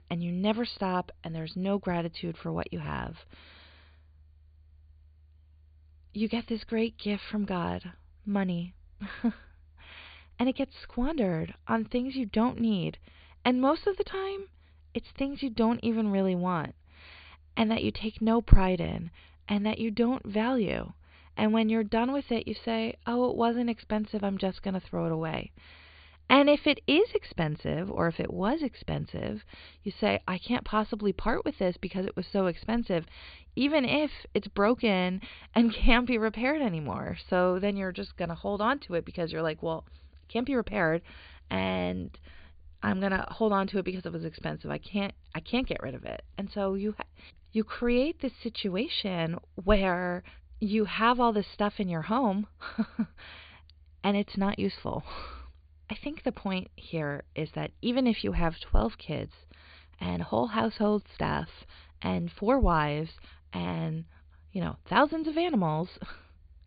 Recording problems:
high frequencies cut off; severe; nothing above 4.5 kHz

